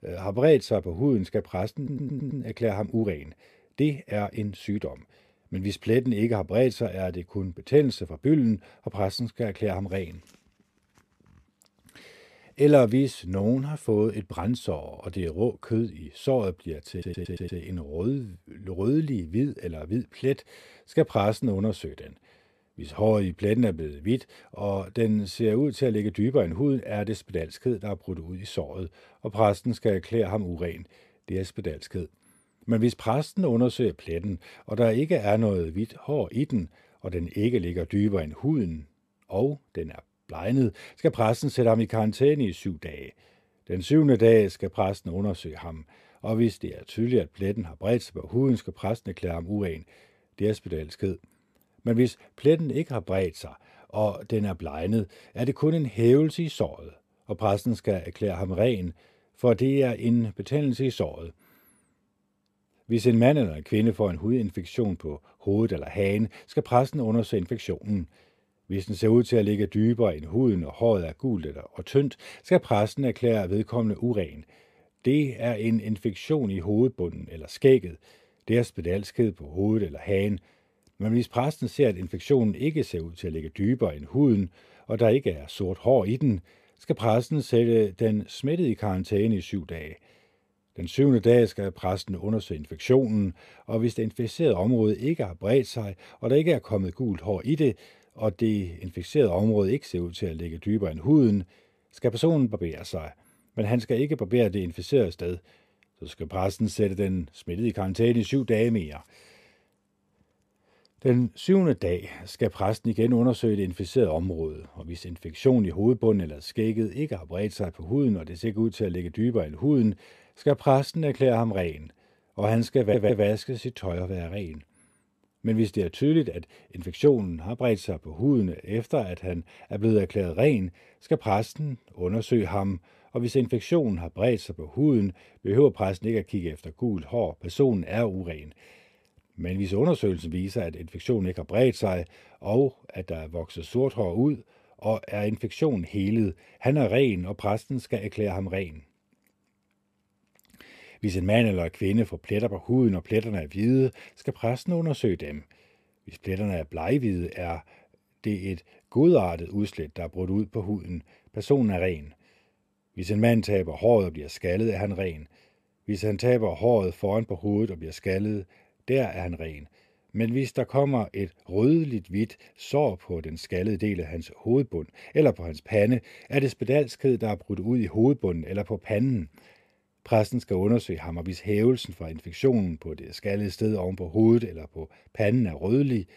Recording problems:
audio stuttering; at 2 s, at 17 s and at 2:03

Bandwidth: 14.5 kHz